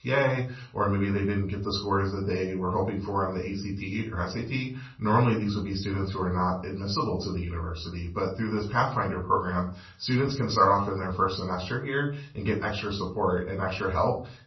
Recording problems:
off-mic speech; far
room echo; slight; dies away in 0.3 s
garbled, watery; slightly; nothing above 5.5 kHz

